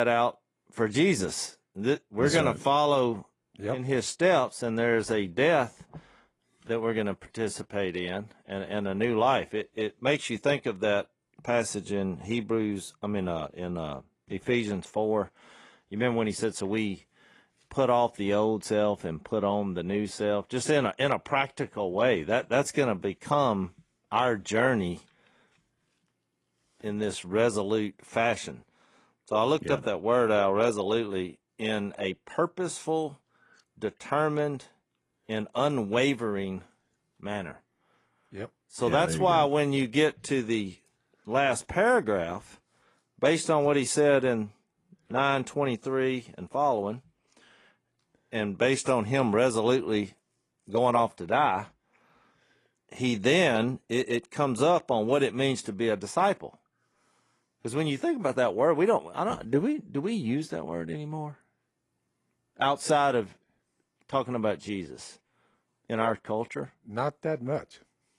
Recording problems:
garbled, watery; slightly
abrupt cut into speech; at the start

